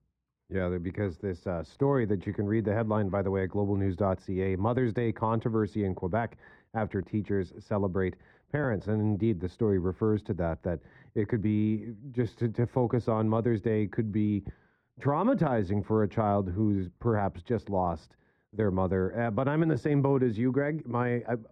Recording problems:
muffled; very; fading above 2.5 kHz

